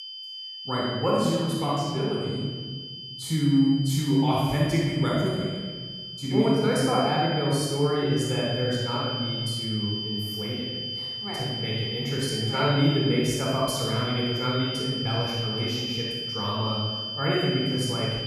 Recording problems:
room echo; strong; dies away in 1.5 s
off-mic speech; far
high-pitched whine; loud; throughout; 3 kHz, 6 dB below the speech

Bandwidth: 14.5 kHz